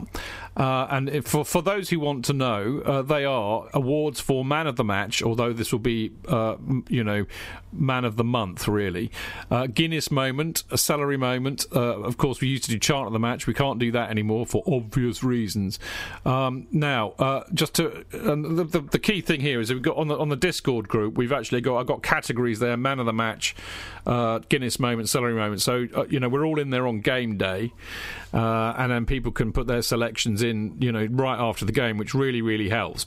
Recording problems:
squashed, flat; somewhat

